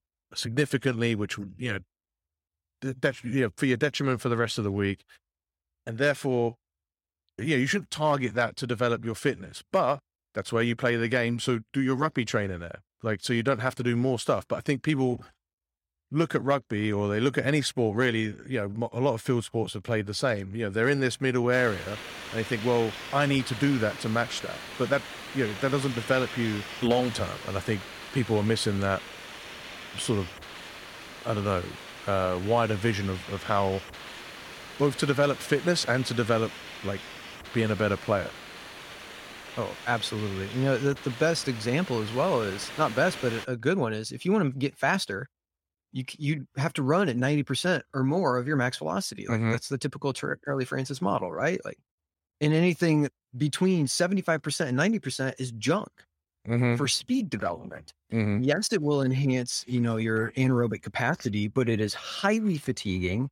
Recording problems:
hiss; noticeable; from 22 to 43 s; 10 dB below the speech

